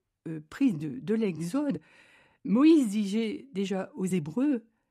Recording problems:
uneven, jittery; strongly; from 0.5 to 4 s

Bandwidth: 14 kHz